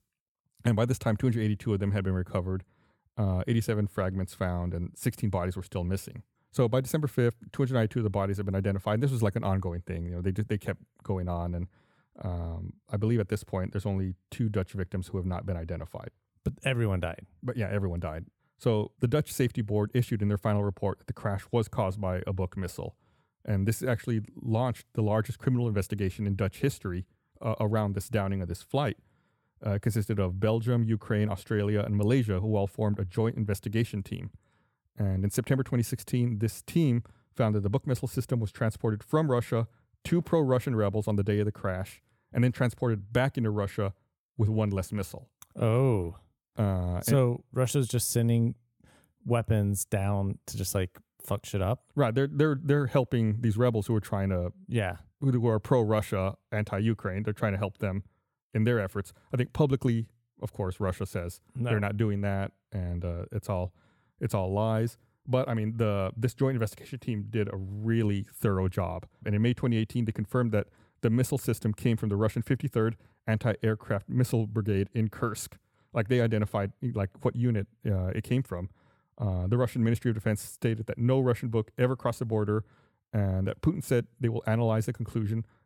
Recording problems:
none

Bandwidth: 17.5 kHz